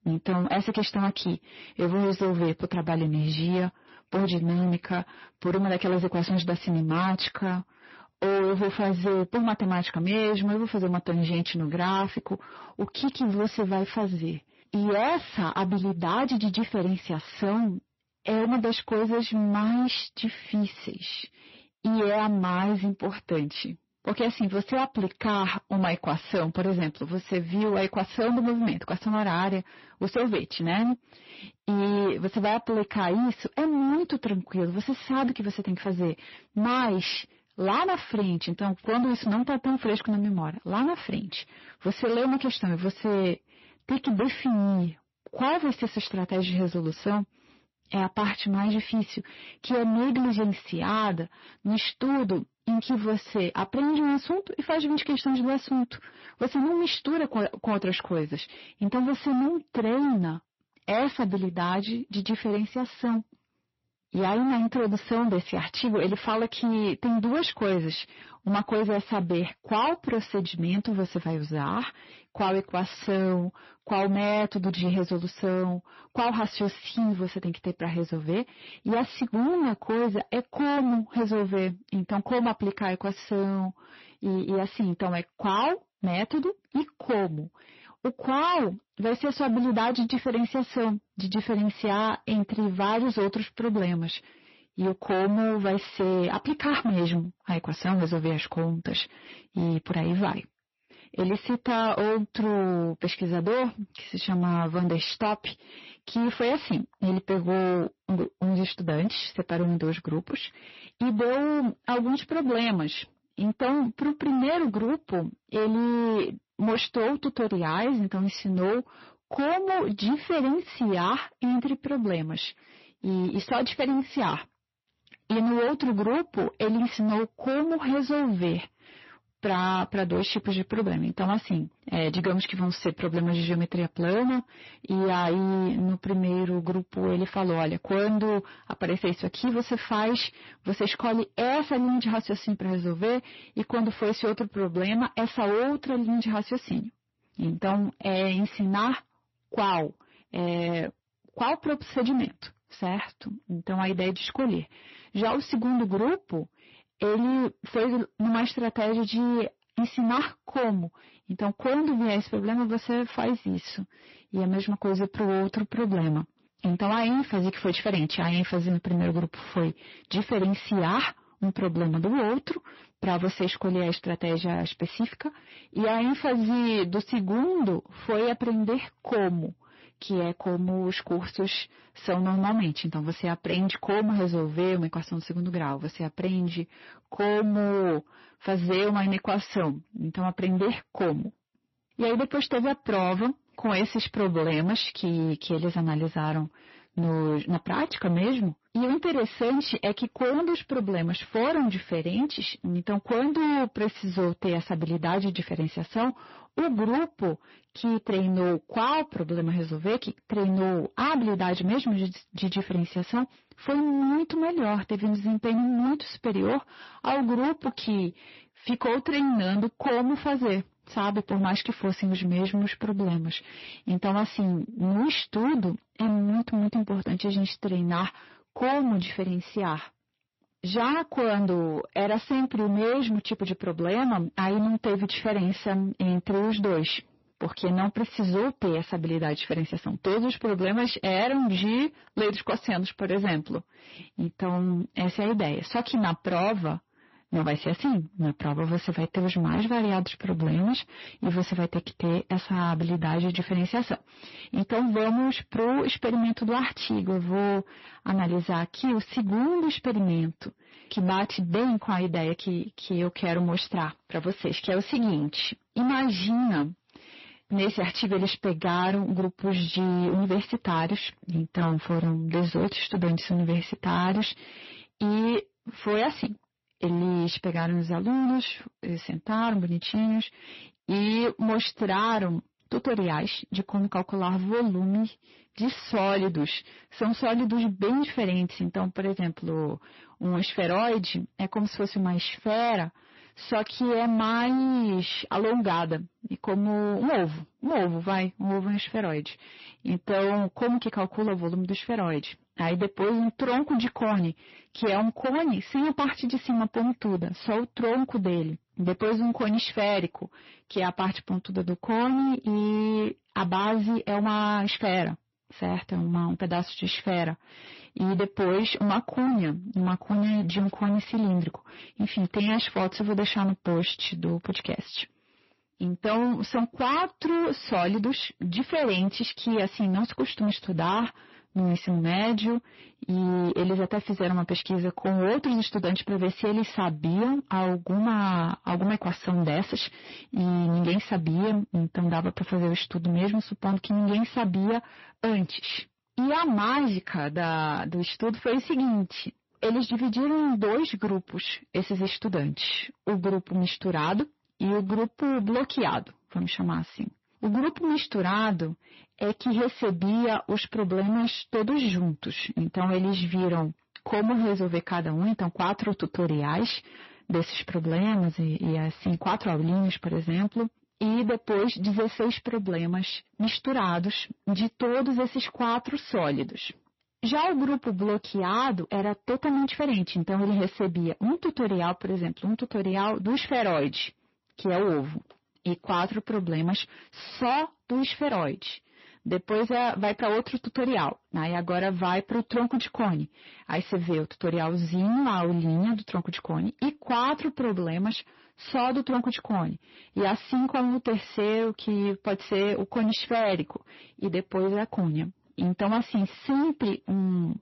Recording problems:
distortion; heavy; 21% of the sound clipped
garbled, watery; slightly; nothing above 5.5 kHz

